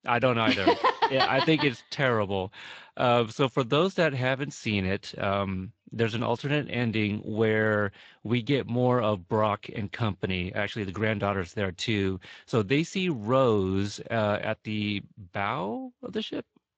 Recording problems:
garbled, watery; slightly; nothing above 7.5 kHz

